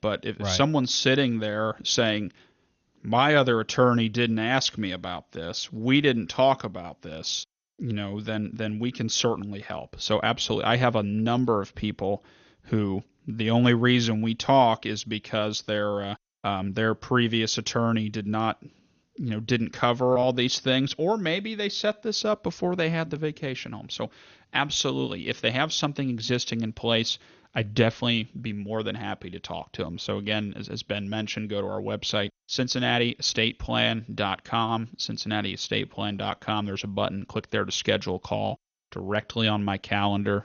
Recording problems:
garbled, watery; slightly; nothing above 6.5 kHz

